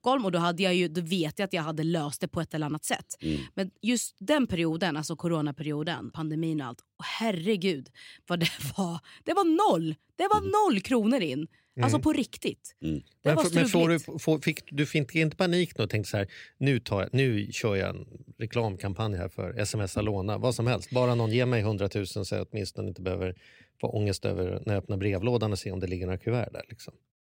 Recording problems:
none

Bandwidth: 16 kHz